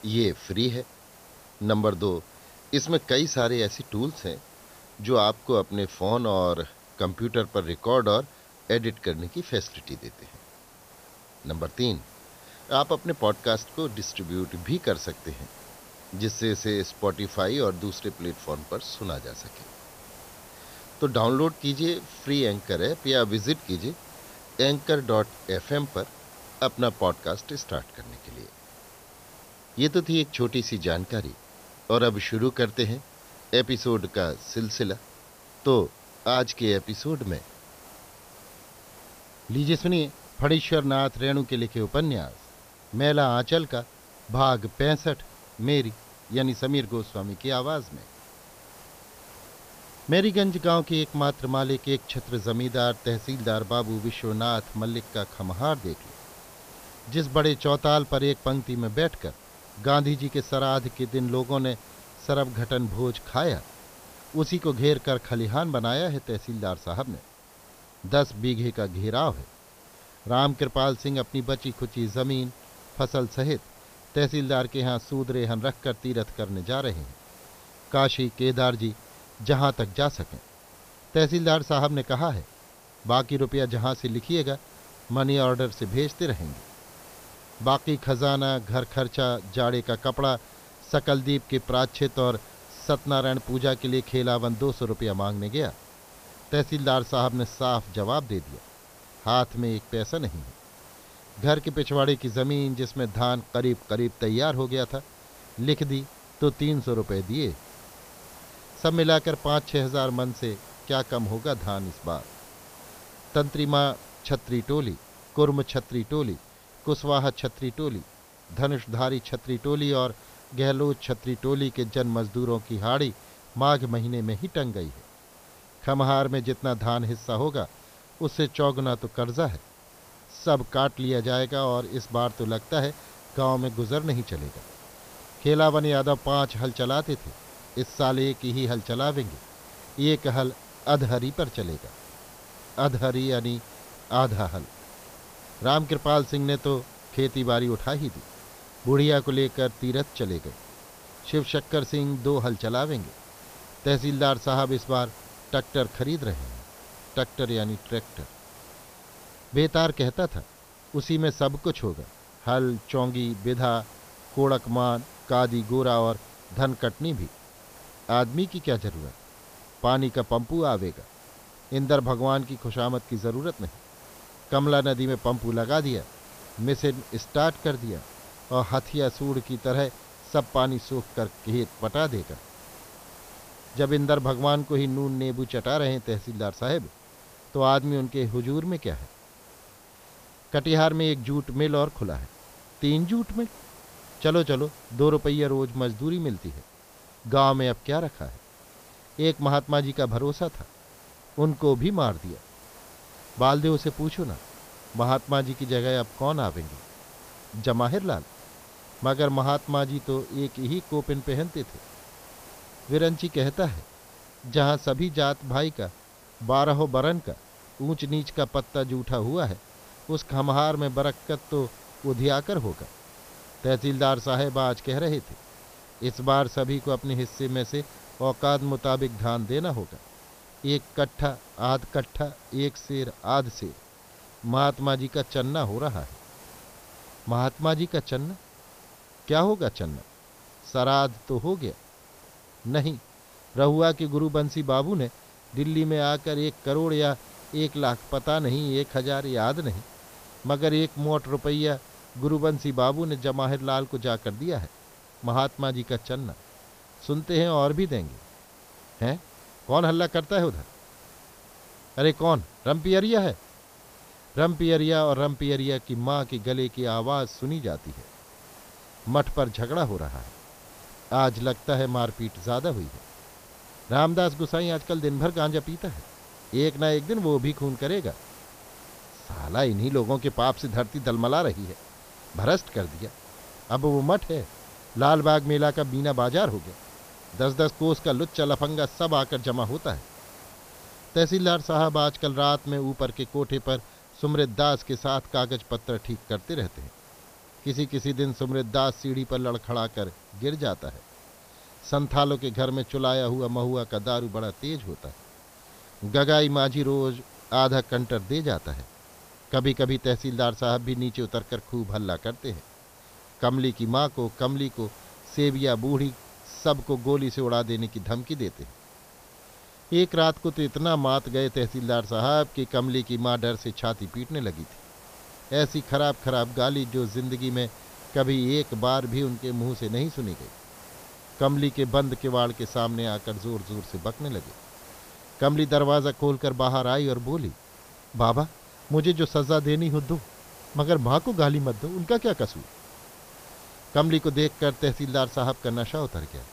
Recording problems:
high frequencies cut off; noticeable; nothing above 6 kHz
hiss; faint; throughout; 20 dB below the speech

